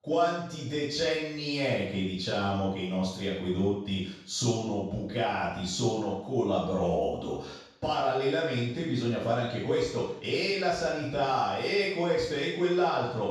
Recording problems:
off-mic speech; far
room echo; noticeable; dies away in 0.6 s

